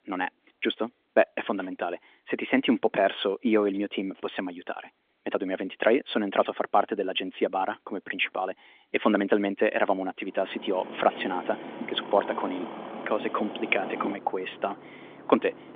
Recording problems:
phone-call audio; nothing above 3.5 kHz
traffic noise; noticeable; from 11 s on; 10 dB below the speech

